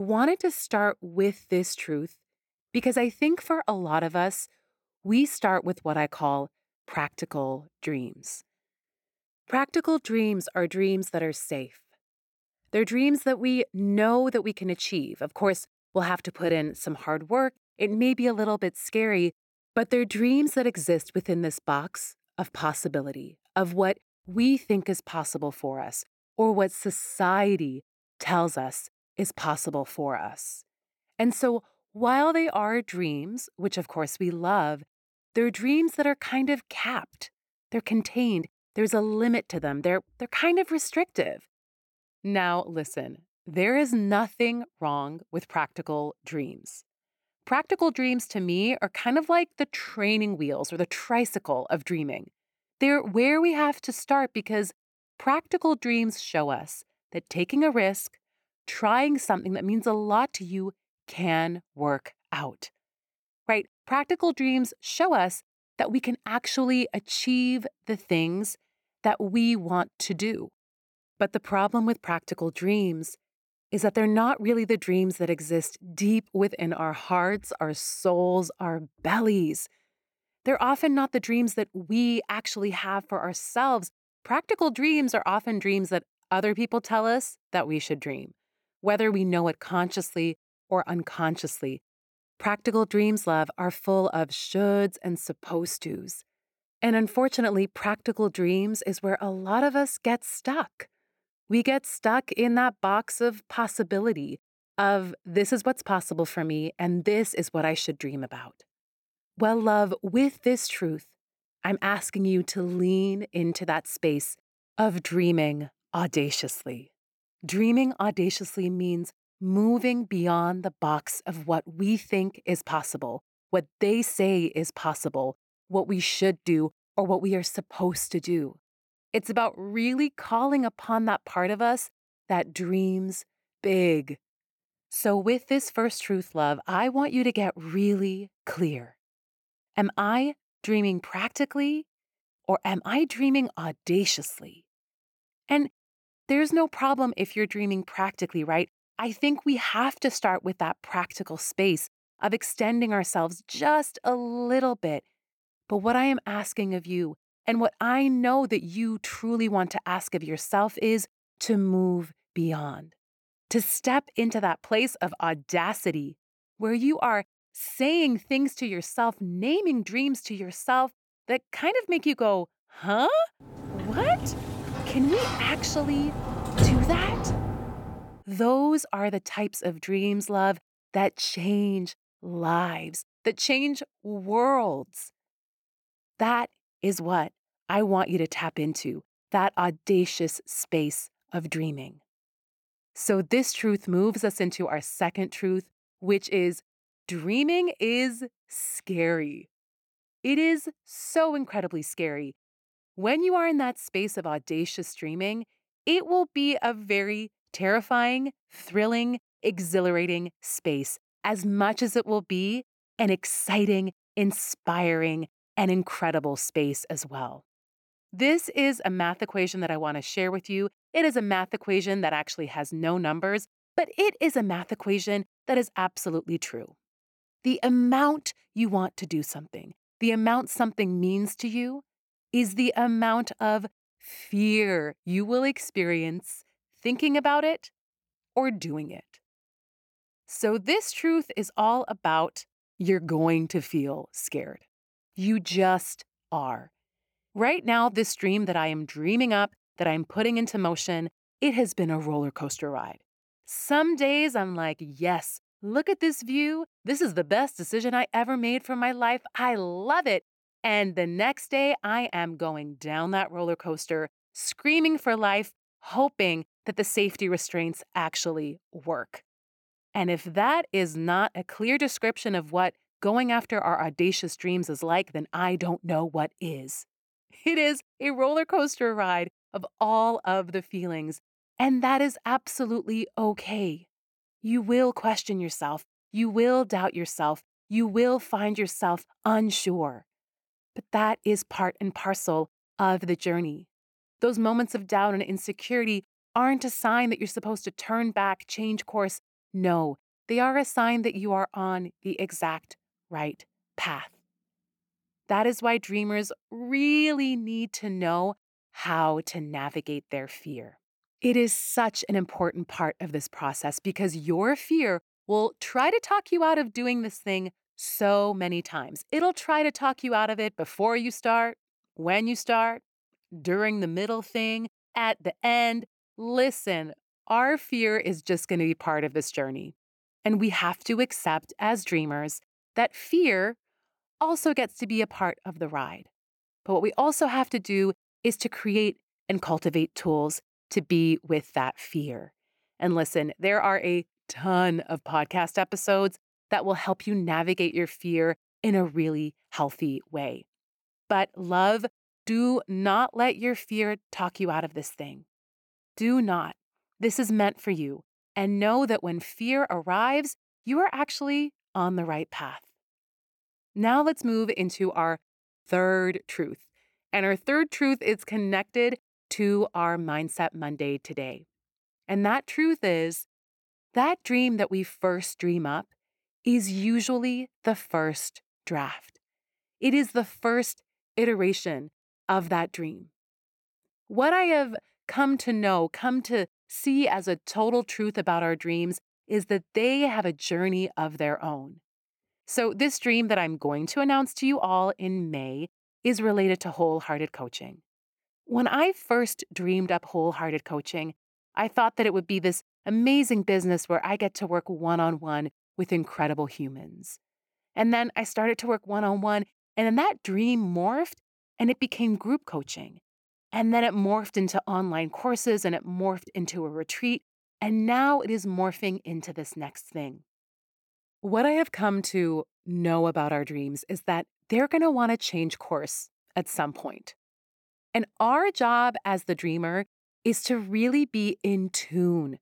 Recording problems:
abrupt cut into speech; at the start
door banging; loud; from 2:54 to 2:58; peak 4 dB above the speech

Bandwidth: 17.5 kHz